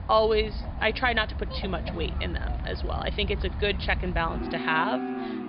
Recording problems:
high frequencies cut off; severe; nothing above 5 kHz
animal sounds; loud; throughout; 5 dB below the speech

